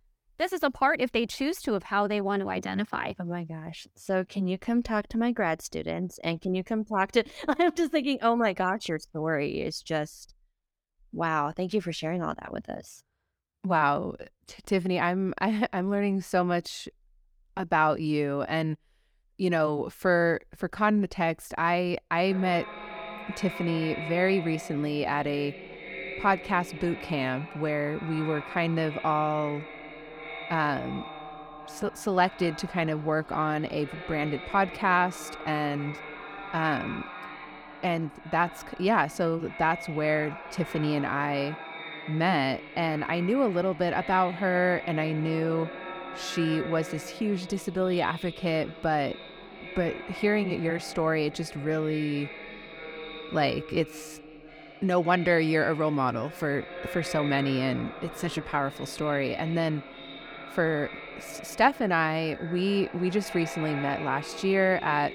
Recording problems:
echo of what is said; noticeable; from 22 s on; 530 ms later, 10 dB below the speech

